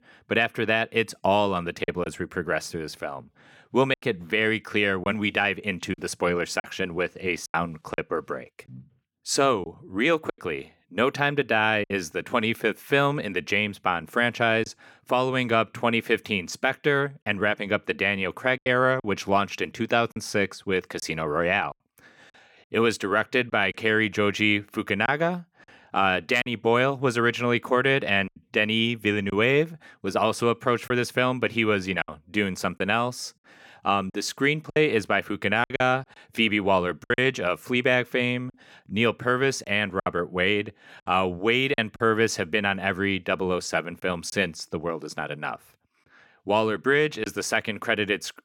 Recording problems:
choppy; occasionally; 4% of the speech affected

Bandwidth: 17.5 kHz